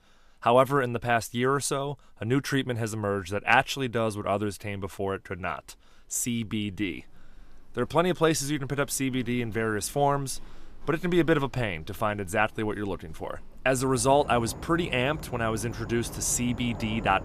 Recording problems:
animal sounds; noticeable; throughout; 15 dB below the speech

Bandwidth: 14.5 kHz